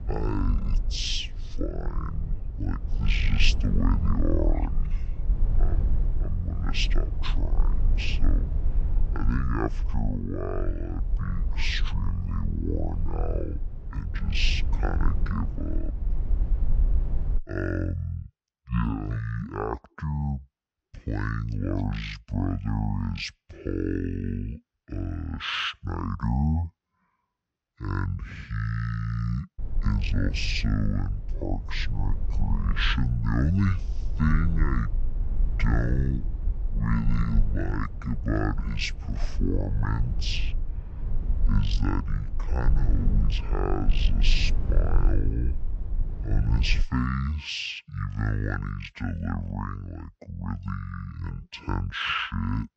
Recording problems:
wrong speed and pitch; too slow and too low; 0.5 times normal speed
low rumble; noticeable; until 17 s and from 30 to 47 s; 15 dB below the speech

